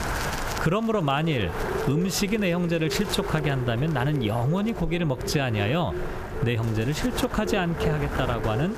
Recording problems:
echo of what is said; strong; throughout; 320 ms later, 10 dB below the speech
squashed, flat; heavily
wind noise on the microphone; heavy; 7 dB below the speech

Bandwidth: 14.5 kHz